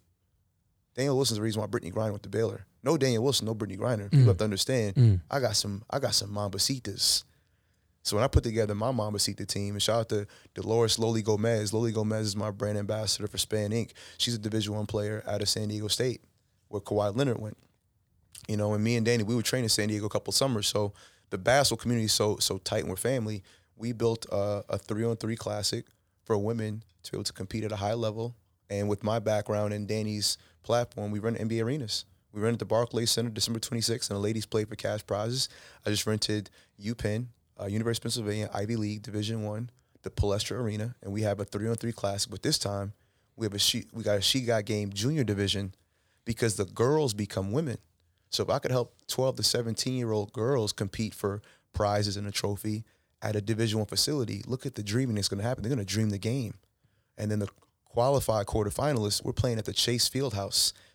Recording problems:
none

